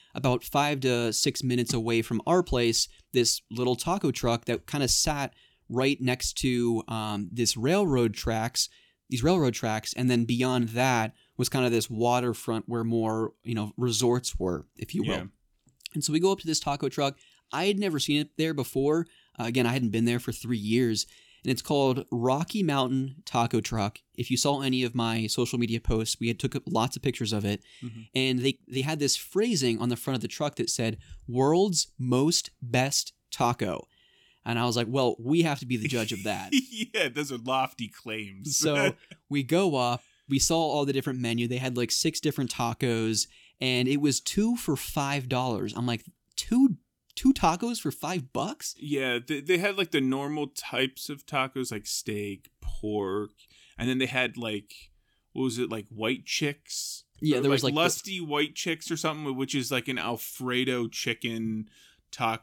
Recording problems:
uneven, jittery; strongly; from 3 to 55 s

